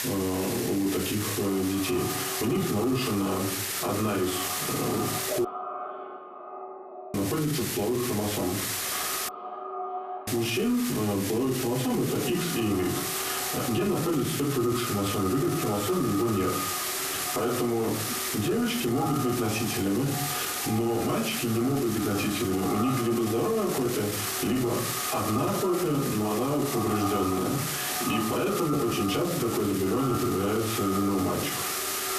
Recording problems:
echo of what is said; strong; throughout; 510 ms later, 9 dB below the speech
off-mic speech; far
squashed, flat; heavily
room echo; very slight; dies away in 0.4 s
hiss; loud; throughout; 5 dB below the speech
audio cutting out; at 5.5 s for 1.5 s and at 9.5 s for 1 s

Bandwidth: 14 kHz